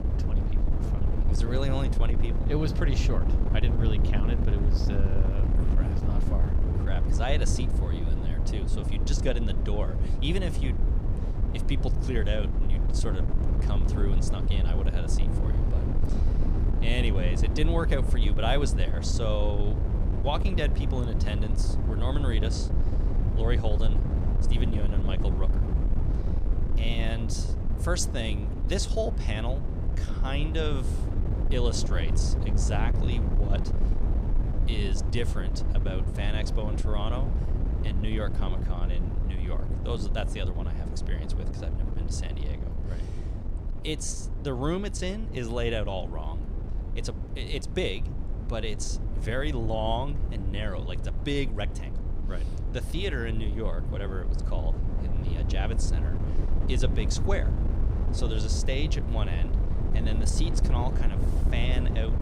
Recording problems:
wind noise on the microphone; heavy; 6 dB below the speech

